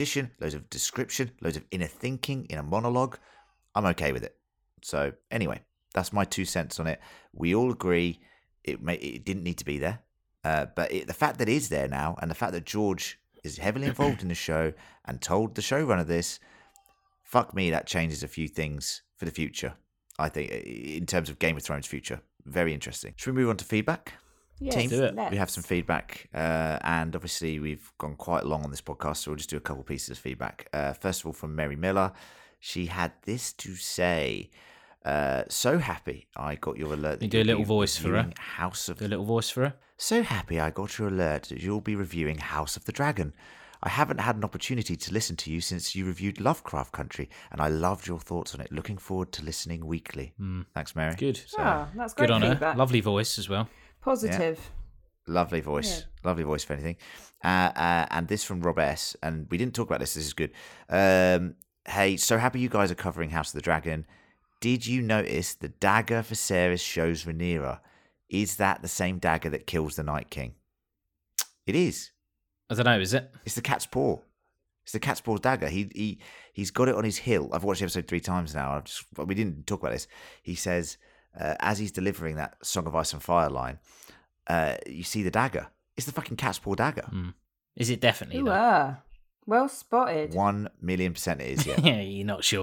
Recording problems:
abrupt cut into speech; at the start and the end

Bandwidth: 18 kHz